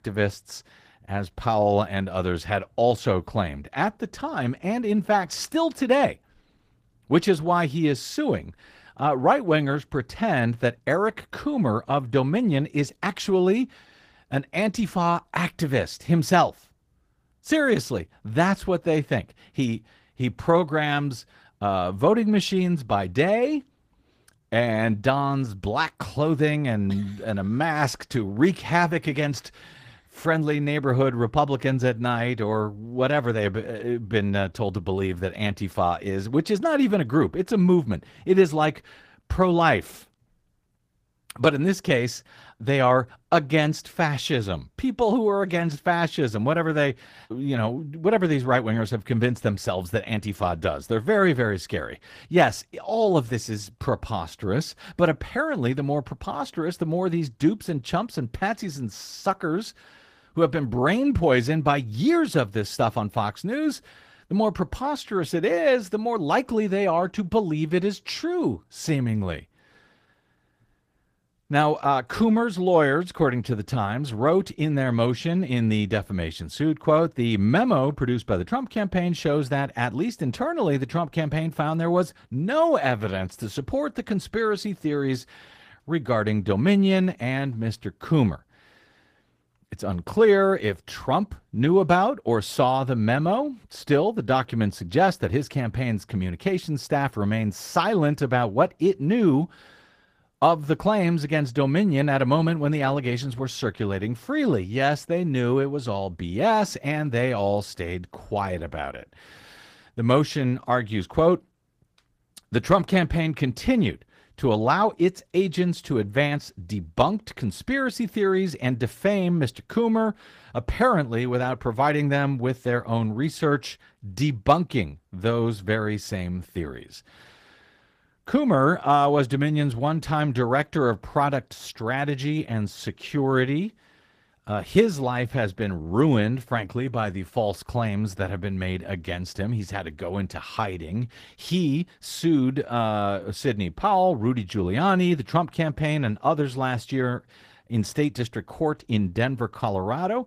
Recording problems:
garbled, watery; slightly; nothing above 15 kHz

